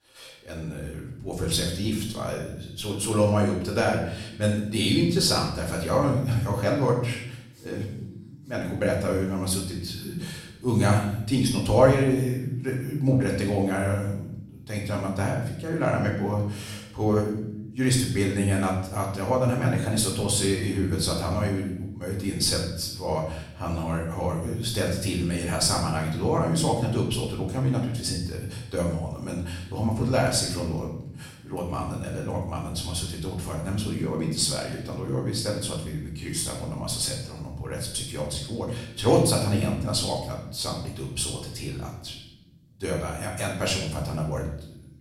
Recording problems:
off-mic speech; far
room echo; noticeable; dies away in 0.7 s

